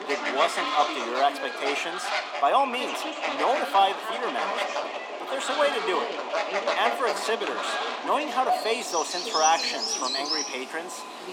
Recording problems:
echo of what is said; noticeable; throughout; 410 ms later, 20 dB below the speech
thin; somewhat; fading below 300 Hz
animal sounds; loud; throughout; 2 dB below the speech
voice in the background; noticeable; throughout; 10 dB below the speech

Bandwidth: 18.5 kHz